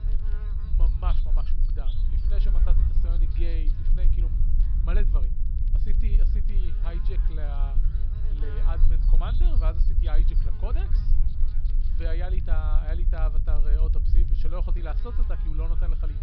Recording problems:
high frequencies cut off; noticeable; nothing above 5.5 kHz
low rumble; loud; throughout; 6 dB below the speech
electrical hum; noticeable; throughout; 60 Hz, 10 dB below the speech
crackle, like an old record; faint; 25 dB below the speech

